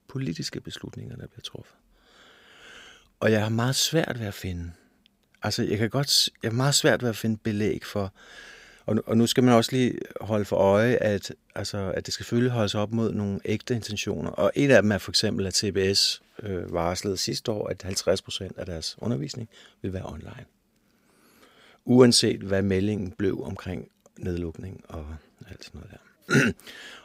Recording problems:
none

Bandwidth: 15.5 kHz